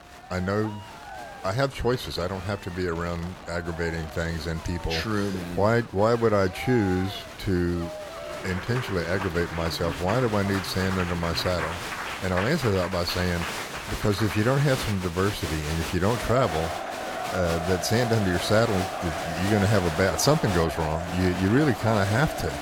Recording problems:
crowd noise; loud; throughout; 7 dB below the speech
wind noise on the microphone; occasional gusts; 20 dB below the speech

